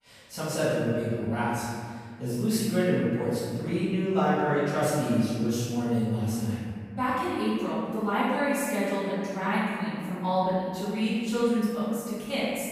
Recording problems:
room echo; strong; dies away in 2 s
off-mic speech; far

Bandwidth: 15 kHz